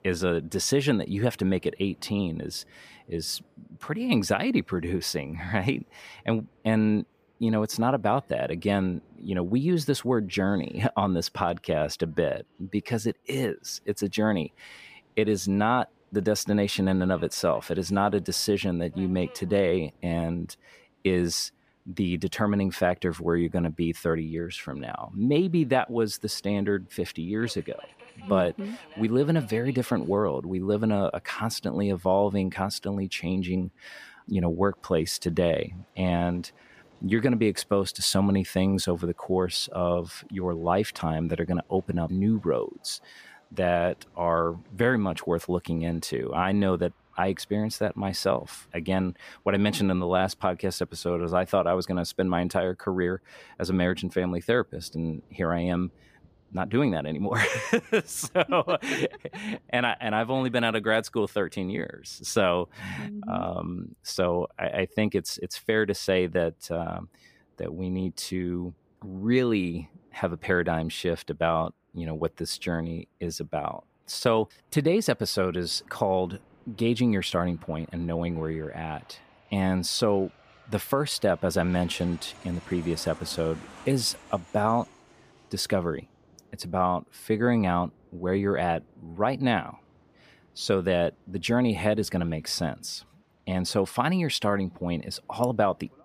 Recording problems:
train or aircraft noise; faint; throughout; 30 dB below the speech

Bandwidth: 15 kHz